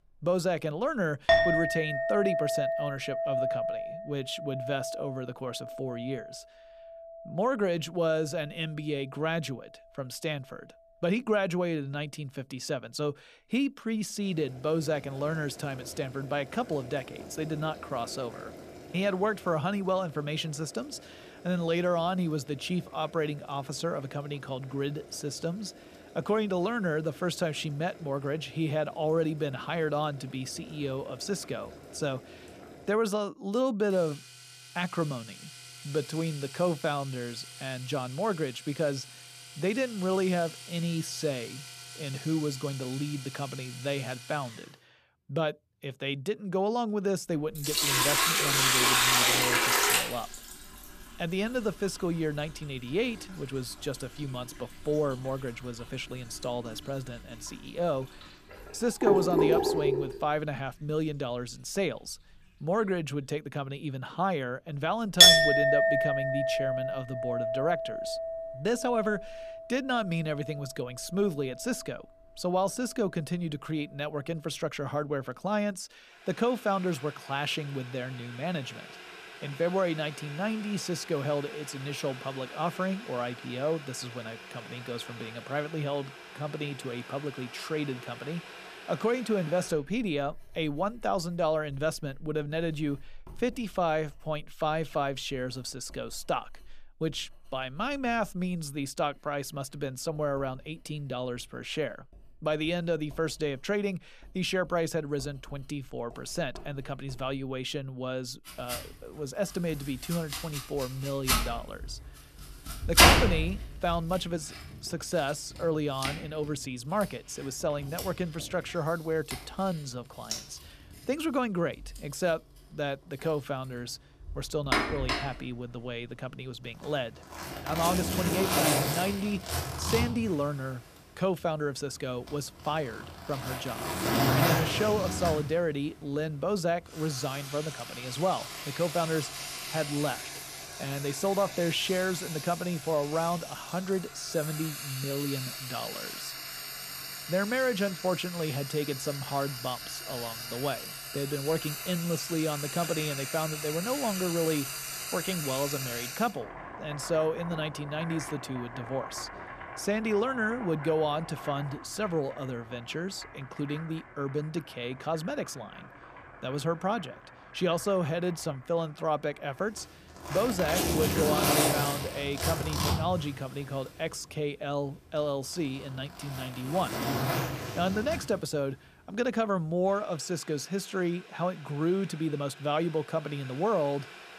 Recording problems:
household noises; very loud; throughout; 2 dB above the speech

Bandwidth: 14.5 kHz